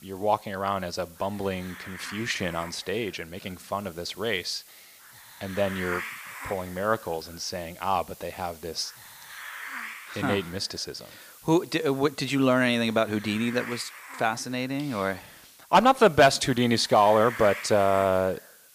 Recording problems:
hiss; noticeable; throughout; 15 dB below the speech

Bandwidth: 15 kHz